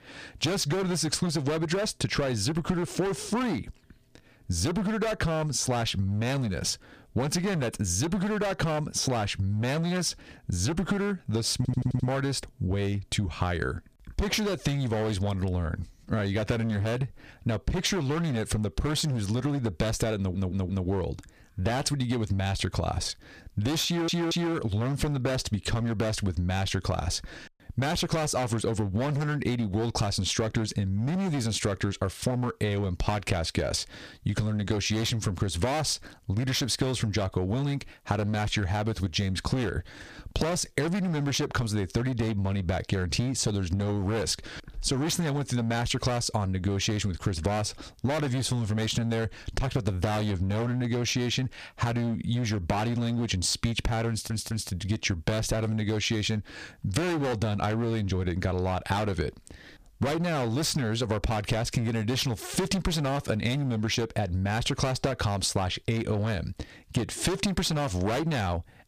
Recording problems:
distortion; heavy; 18% of the sound clipped
squashed, flat; somewhat
audio stuttering; 4 times, first at 12 s

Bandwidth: 15 kHz